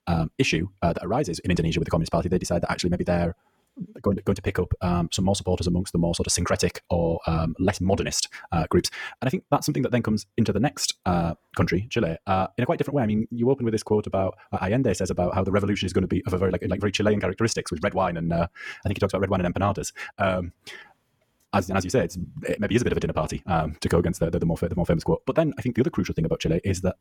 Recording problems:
wrong speed, natural pitch; too fast; 1.5 times normal speed

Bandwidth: 18 kHz